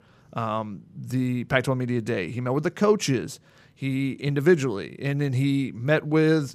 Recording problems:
none

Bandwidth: 15 kHz